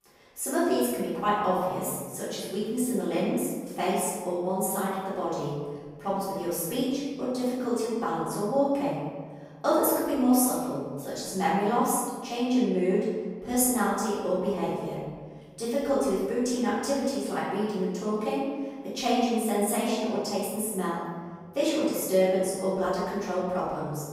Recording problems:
room echo; strong; dies away in 1.6 s
off-mic speech; far

